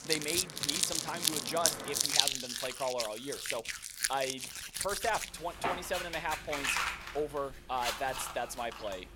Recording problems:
household noises; very loud; throughout; 4 dB above the speech
traffic noise; loud; until 2 s; 9 dB below the speech

